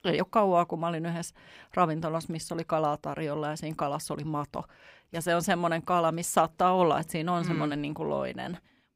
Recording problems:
none

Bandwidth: 15.5 kHz